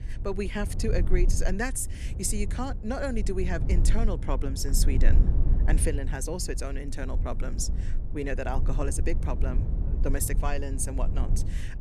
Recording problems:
low rumble; noticeable; throughout; 10 dB below the speech

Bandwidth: 13.5 kHz